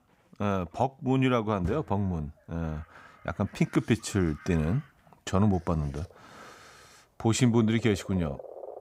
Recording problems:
animal sounds; faint; throughout; 20 dB below the speech

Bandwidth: 15.5 kHz